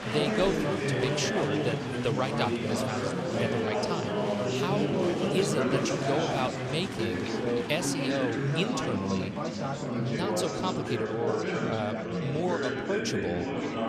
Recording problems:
chatter from many people; very loud; throughout; 3 dB above the speech

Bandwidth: 13.5 kHz